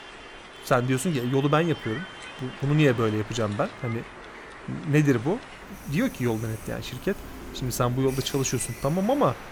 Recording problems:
train or aircraft noise; noticeable; throughout; 15 dB below the speech

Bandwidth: 18.5 kHz